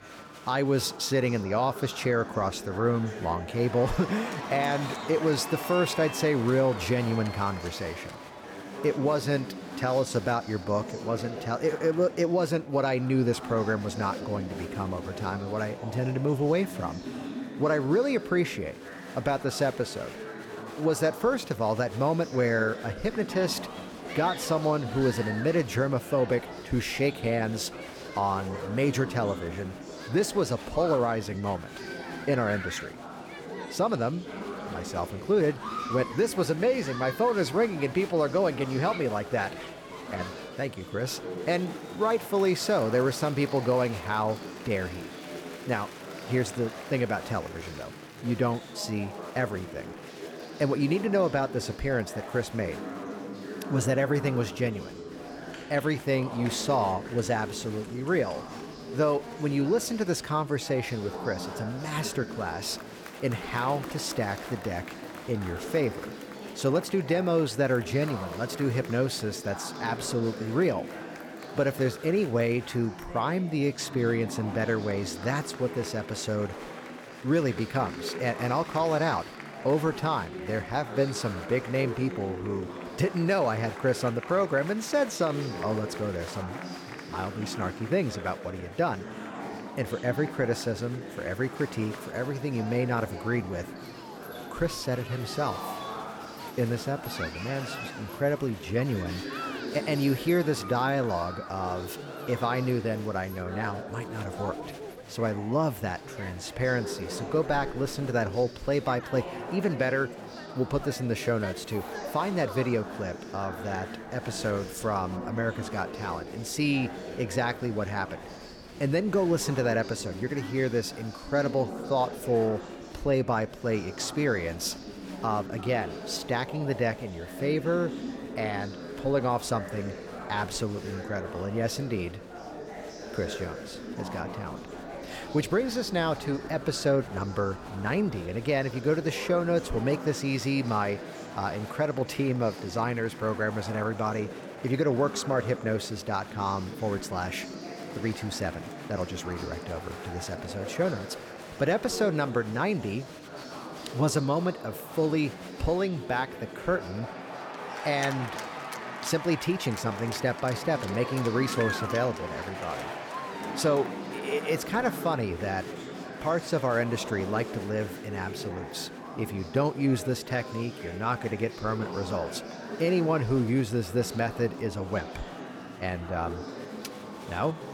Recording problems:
murmuring crowd; loud; throughout; 10 dB below the speech

